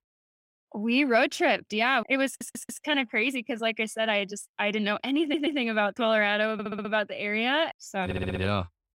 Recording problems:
audio stuttering; 4 times, first at 2.5 s

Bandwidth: 16 kHz